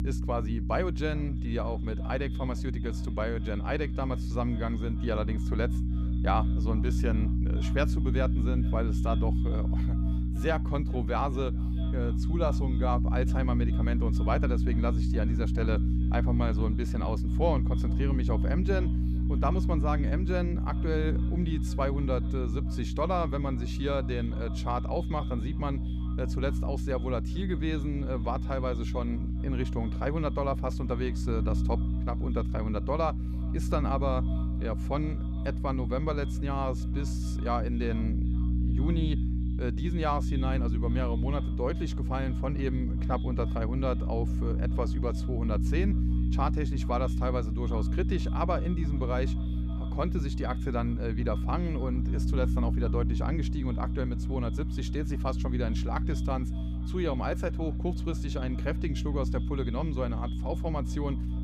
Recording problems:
echo of what is said; faint; throughout; 420 ms later, 25 dB below the speech
electrical hum; loud; throughout; 60 Hz, 8 dB below the speech

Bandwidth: 14.5 kHz